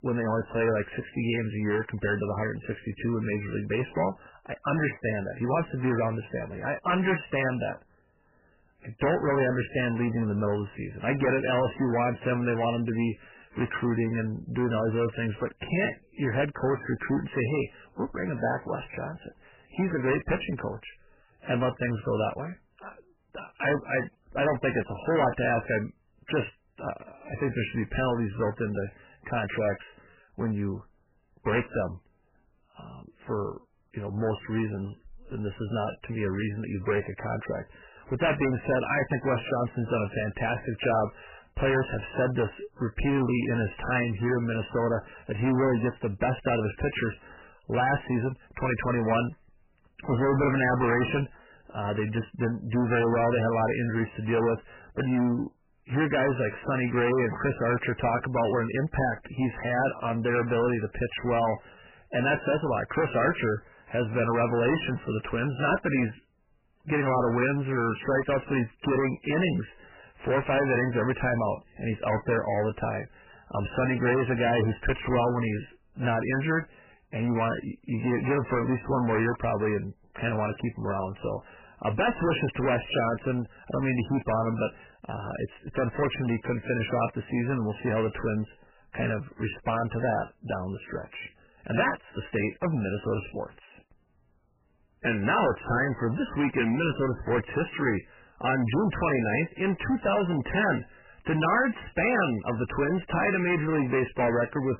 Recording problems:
distortion; heavy; 11% of the sound clipped
garbled, watery; badly; nothing above 3 kHz

